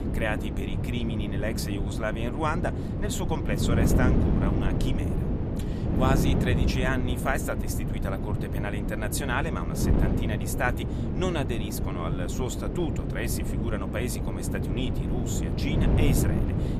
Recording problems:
wind noise on the microphone; heavy; 3 dB below the speech

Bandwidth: 14.5 kHz